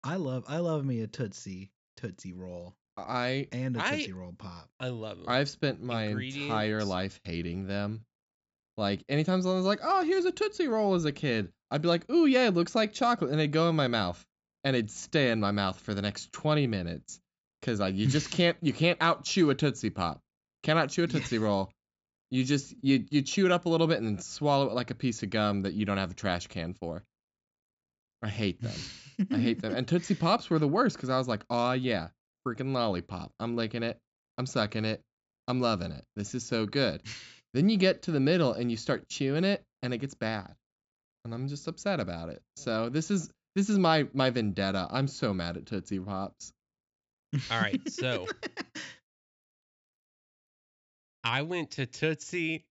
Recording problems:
high frequencies cut off; noticeable; nothing above 8 kHz

